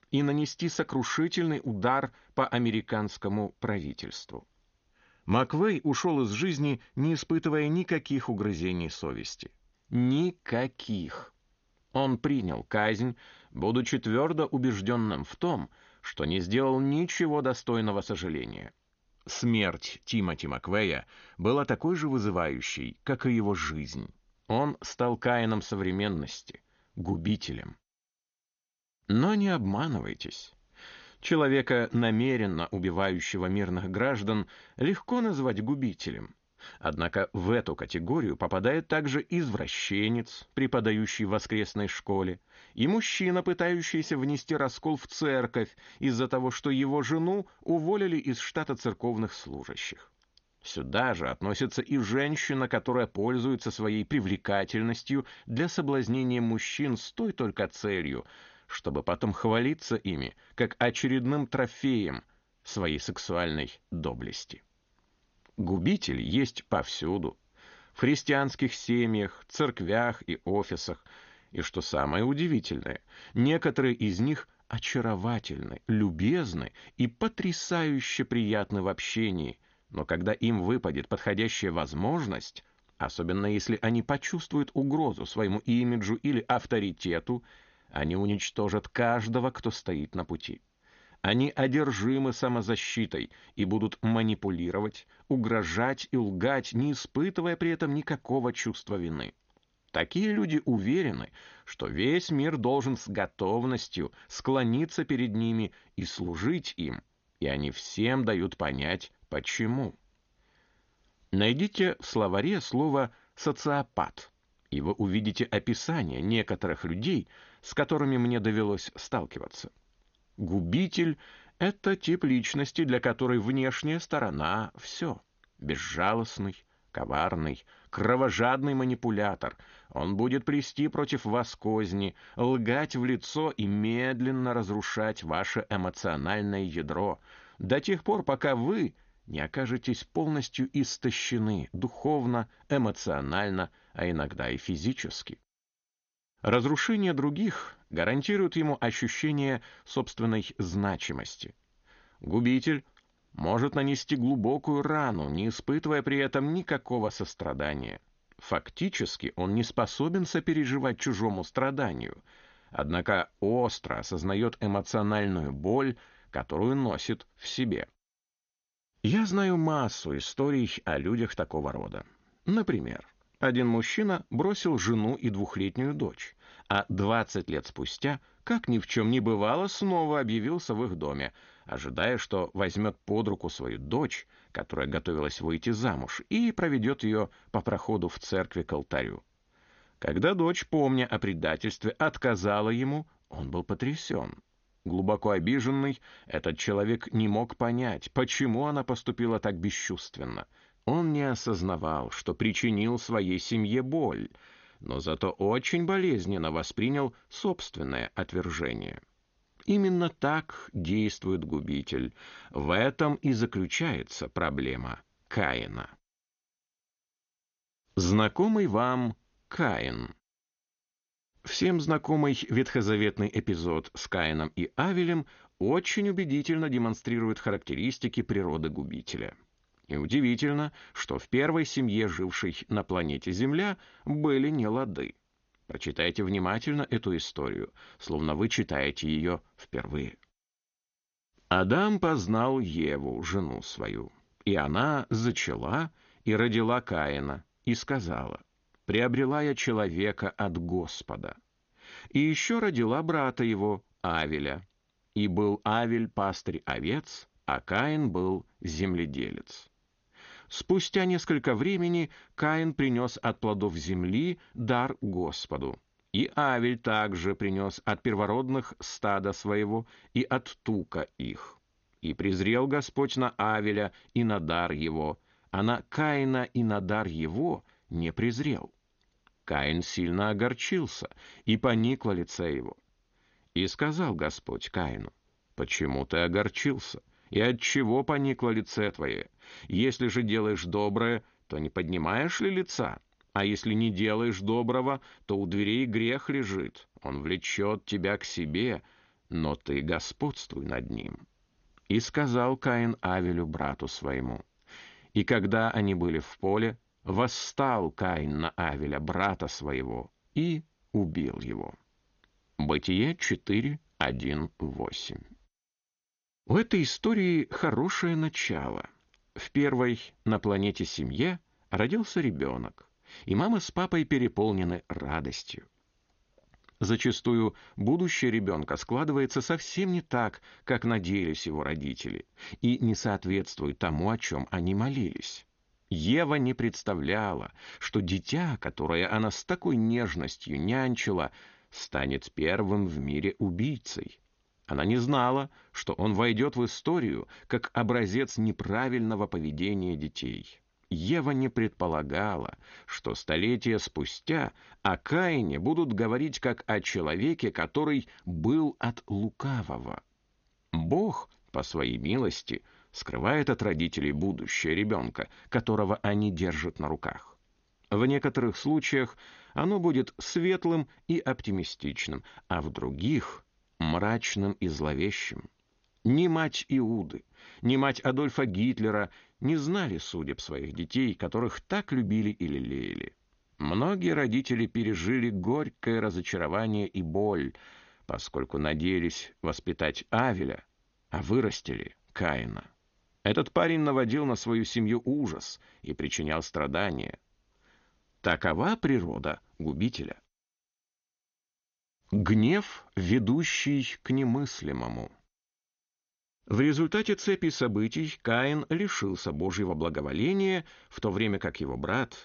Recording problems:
garbled, watery; slightly; nothing above 6.5 kHz

